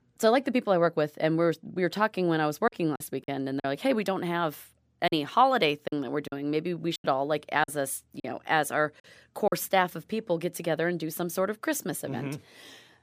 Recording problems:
choppy; occasionally; 5% of the speech affected

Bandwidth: 15 kHz